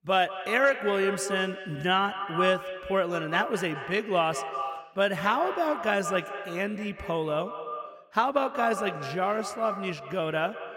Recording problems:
echo of what is said; strong; throughout; 180 ms later, 8 dB below the speech

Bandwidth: 16 kHz